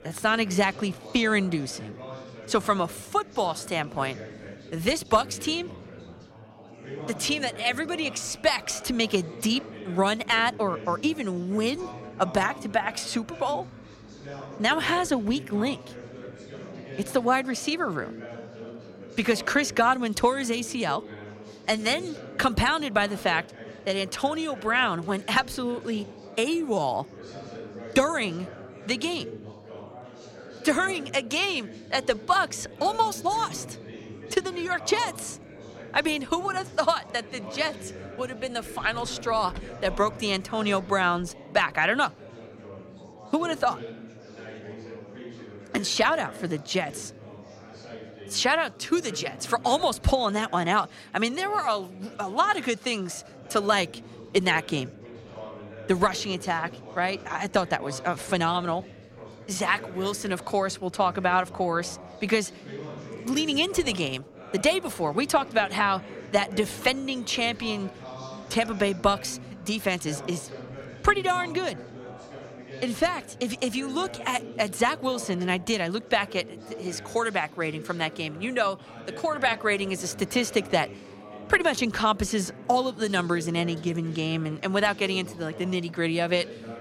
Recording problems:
chatter from many people; noticeable; throughout; 15 dB below the speech

